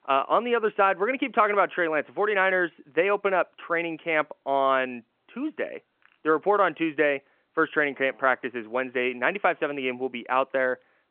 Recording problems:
phone-call audio

